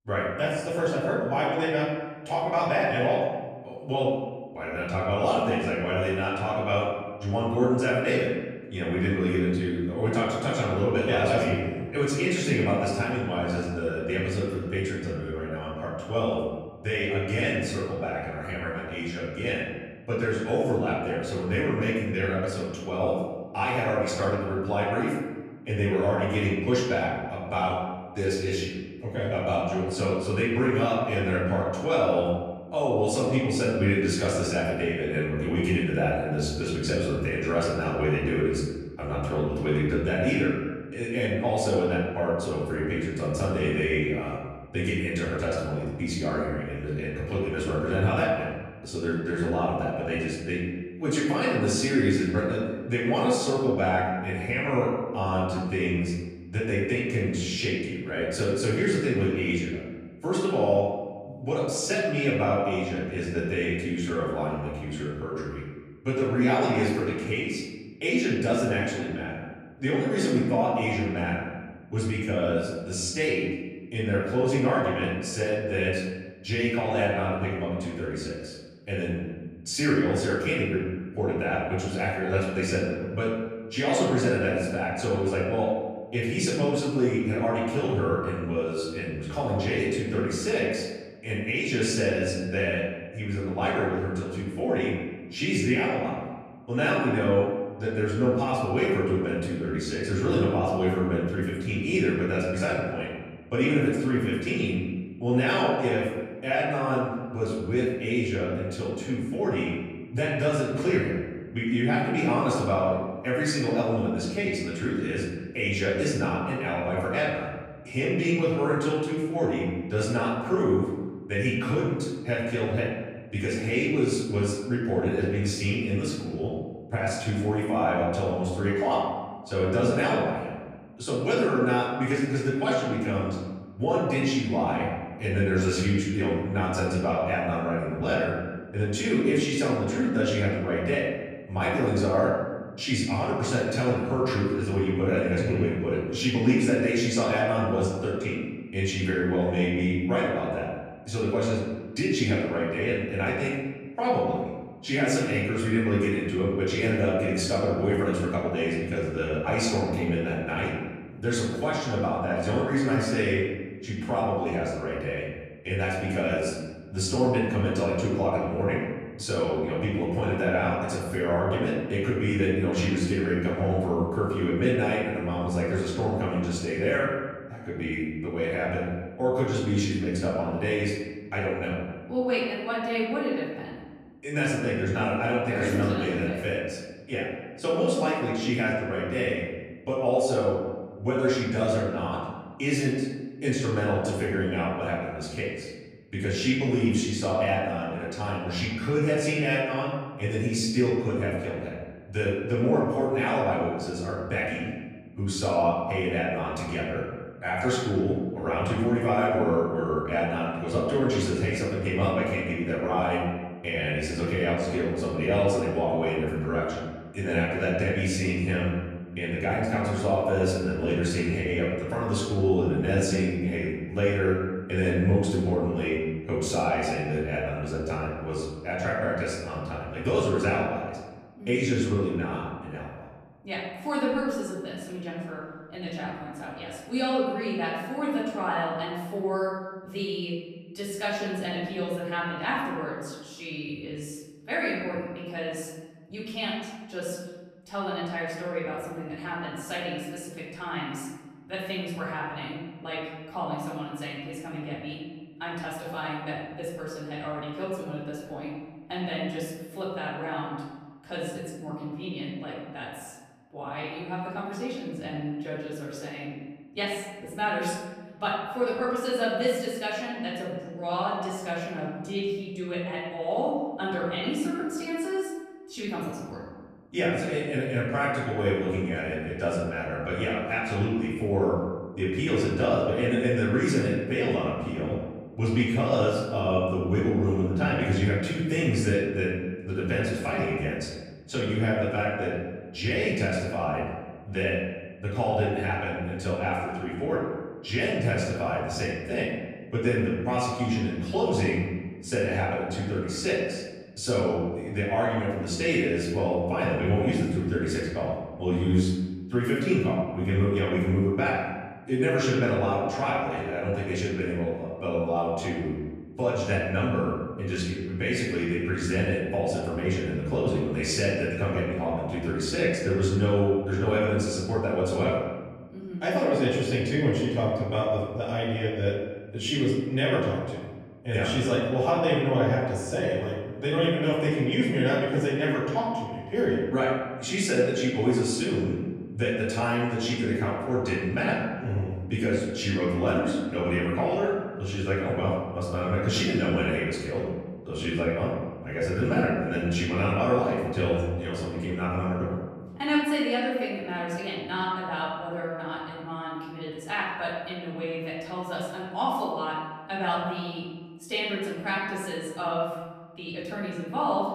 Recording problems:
off-mic speech; far
room echo; noticeable; dies away in 1.2 s

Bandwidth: 15 kHz